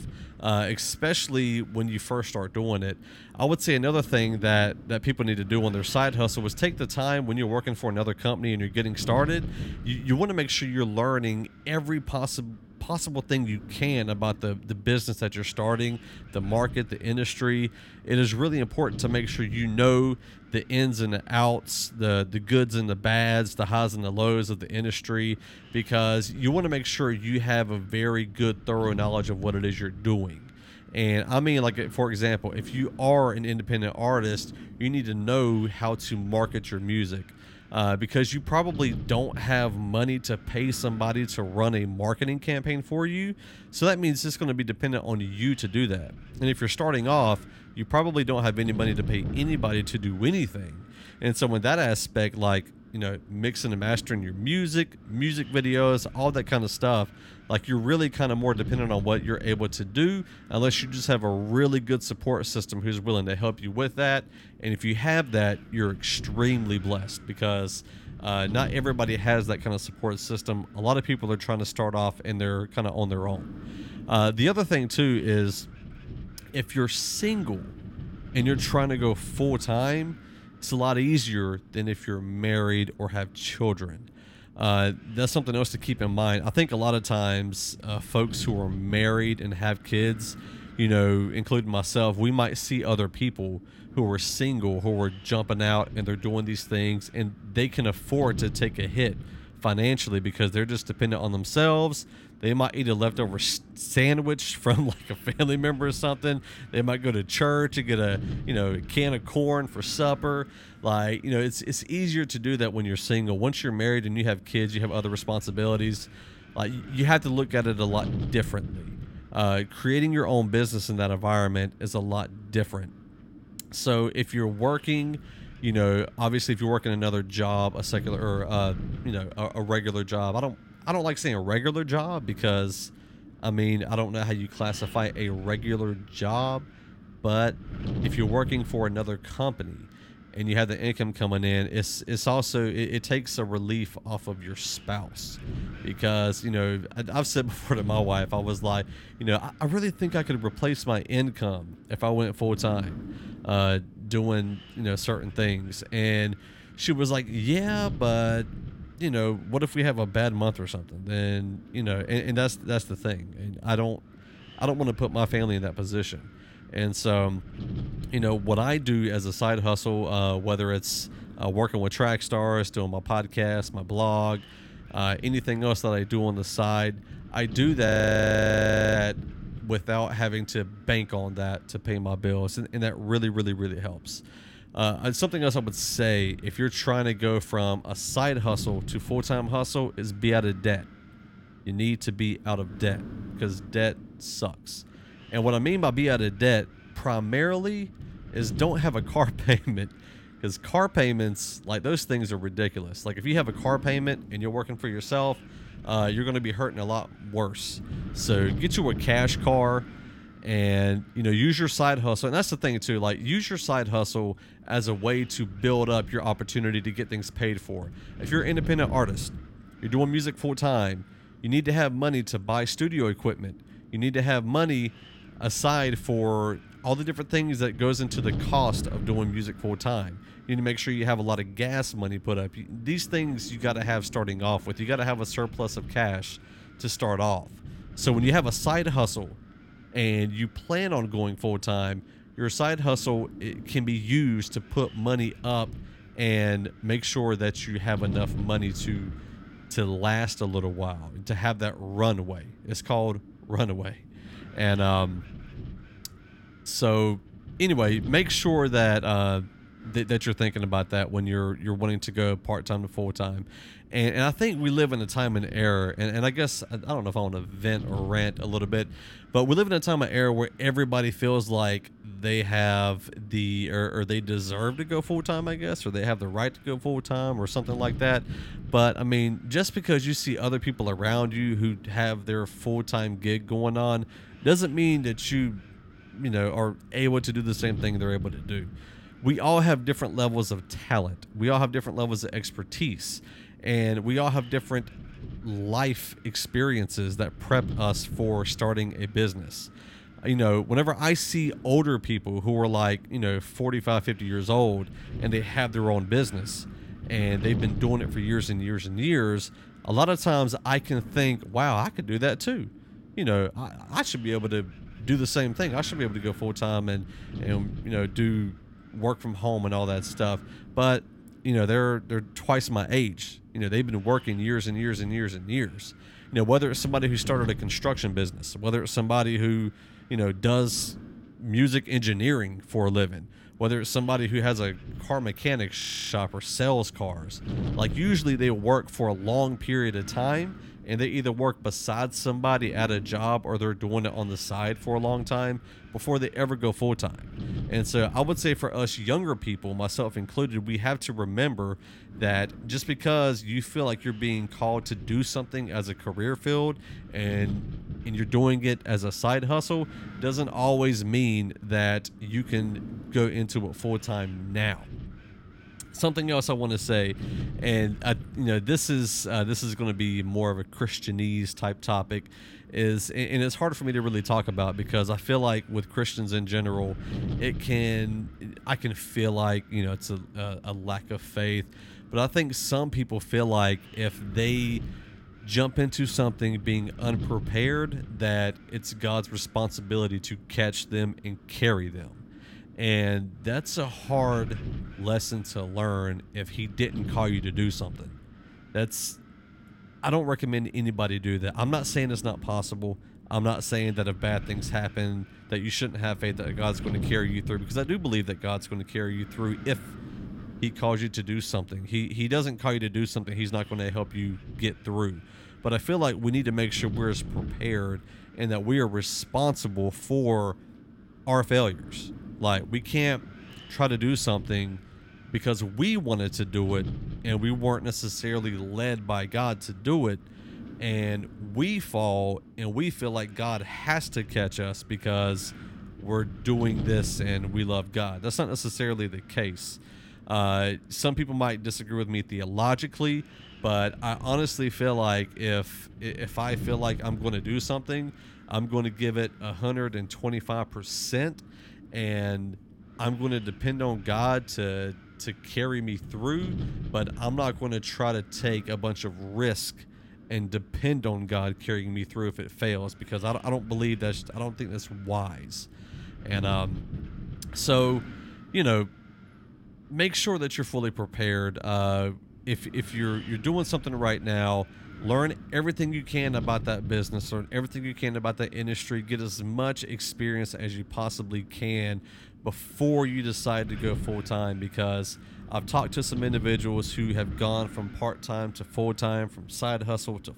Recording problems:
wind noise on the microphone; occasional gusts; 20 dB below the speech
audio freezing; at 2:58 for 1 s and at 5:36

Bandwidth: 16.5 kHz